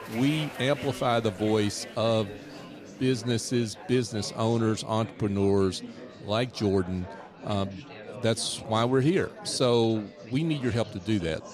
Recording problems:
chatter from many people; noticeable; throughout; 15 dB below the speech

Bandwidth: 14.5 kHz